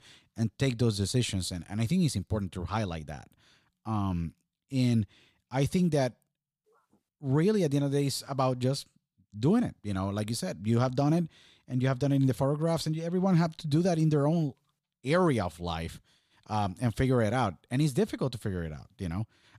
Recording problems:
none

